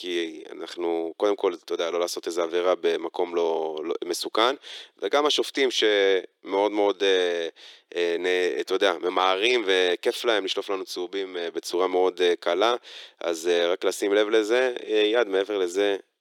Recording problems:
thin; very; fading below 350 Hz

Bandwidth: 17.5 kHz